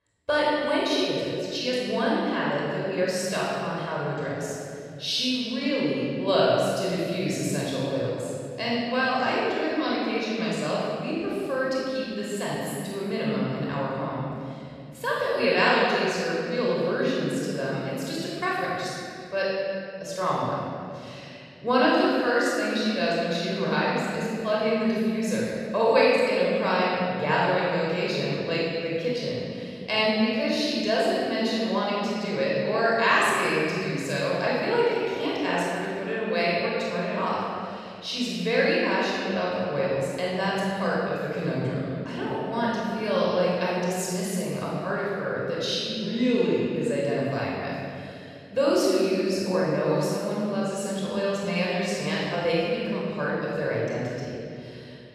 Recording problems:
room echo; strong; dies away in 2.3 s
off-mic speech; far

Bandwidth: 14 kHz